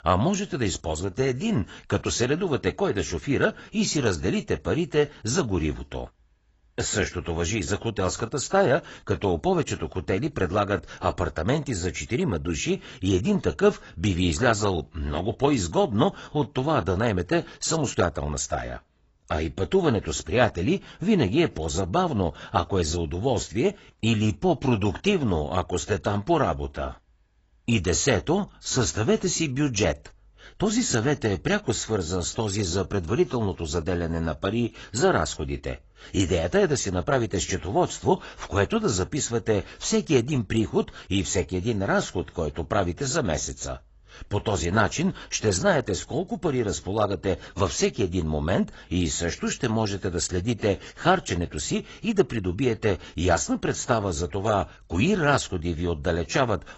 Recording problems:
garbled, watery; badly; nothing above 8 kHz

